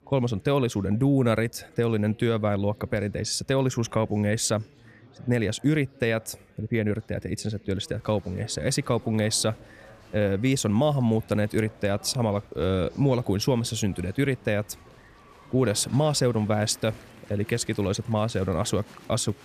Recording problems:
chatter from many people; faint; throughout; 25 dB below the speech

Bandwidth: 14.5 kHz